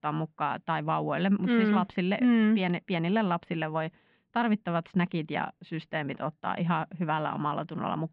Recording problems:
muffled; very; fading above 2.5 kHz

